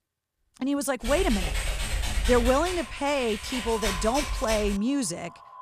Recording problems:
echo of what is said; noticeable; from 2.5 s on; 350 ms later, 20 dB below the speech
keyboard typing; noticeable; from 1 to 5 s; peak 2 dB below the speech

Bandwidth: 14.5 kHz